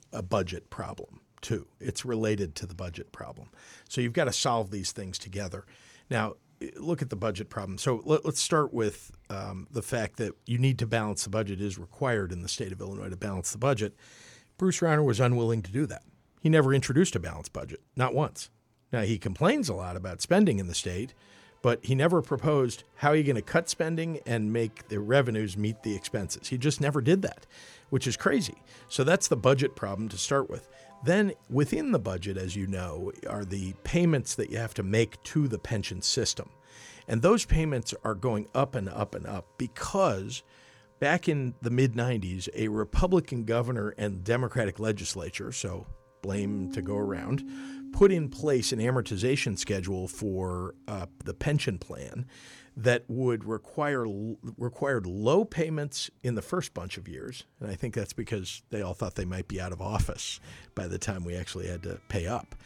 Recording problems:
background music; faint; from 21 s on; 20 dB below the speech

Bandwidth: 18.5 kHz